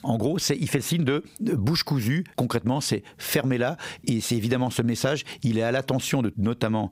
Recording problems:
squashed, flat; heavily

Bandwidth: 15.5 kHz